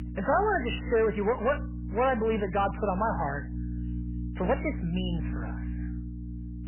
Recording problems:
garbled, watery; badly; nothing above 3 kHz
distortion; slight; 10 dB below the speech
electrical hum; noticeable; throughout; 60 Hz, 20 dB below the speech

